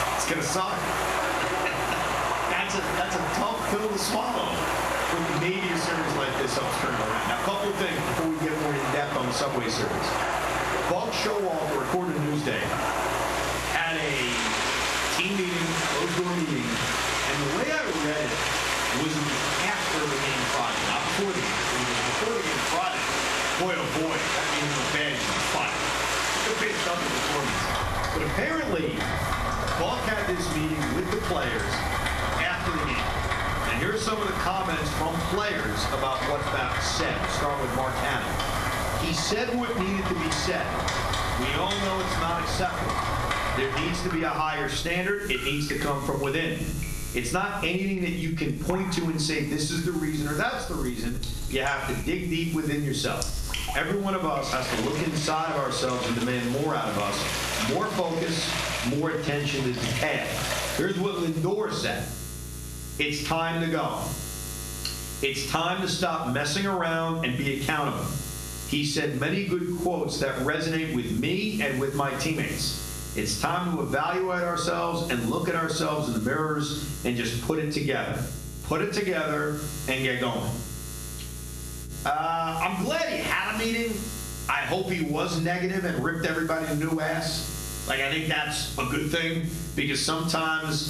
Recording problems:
off-mic speech; far
room echo; slight; dies away in 0.5 s
squashed, flat; somewhat, background pumping
rain or running water; loud; until 1:01; 1 dB below the speech
electrical hum; noticeable; throughout; 60 Hz, 15 dB below the speech

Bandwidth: 14 kHz